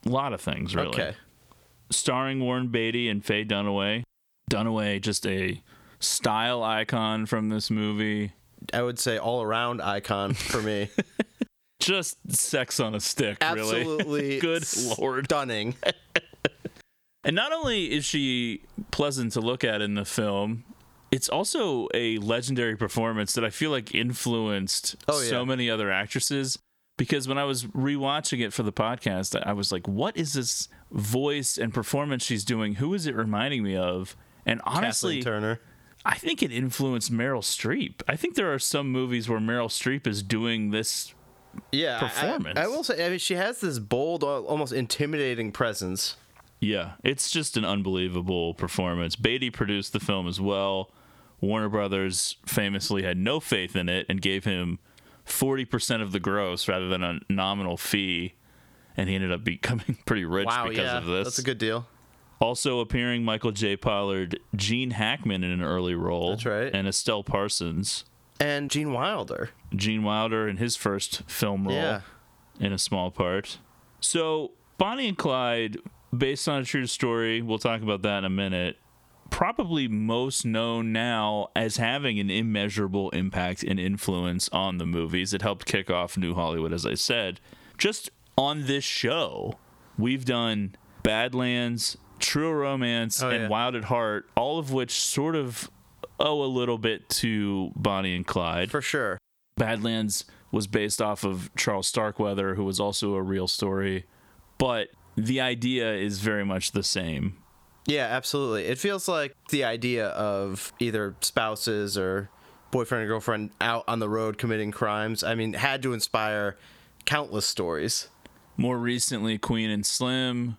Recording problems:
squashed, flat; heavily

